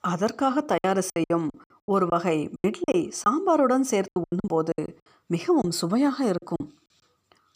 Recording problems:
choppy; very; 14% of the speech affected

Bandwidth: 15 kHz